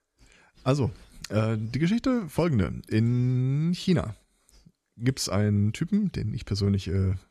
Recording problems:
none

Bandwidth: 13.5 kHz